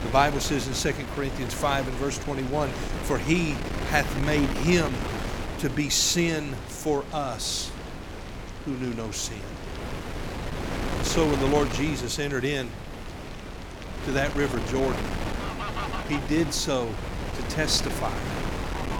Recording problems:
wind noise on the microphone; heavy; 7 dB below the speech
animal sounds; noticeable; throughout; 20 dB below the speech

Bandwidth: 18 kHz